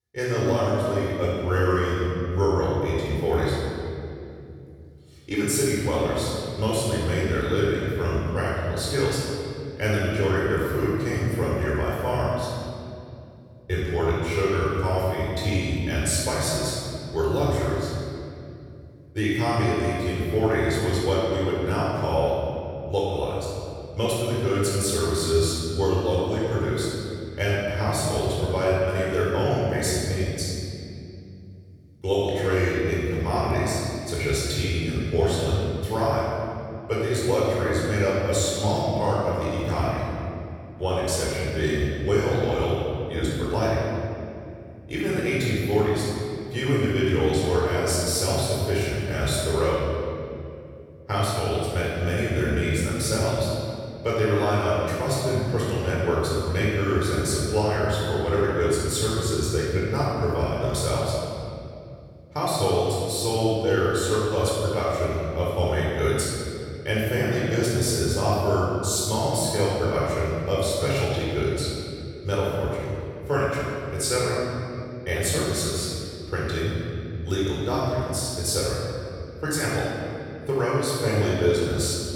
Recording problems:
room echo; strong; dies away in 2.5 s
off-mic speech; far

